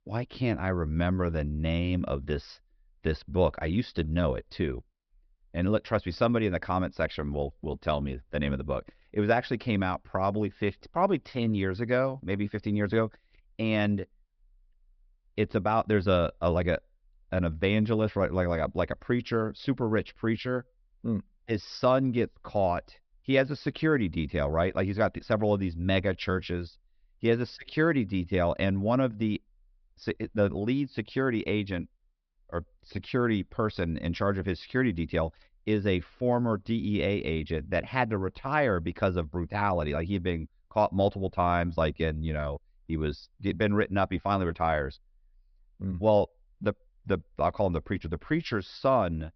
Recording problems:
high frequencies cut off; noticeable; nothing above 5.5 kHz

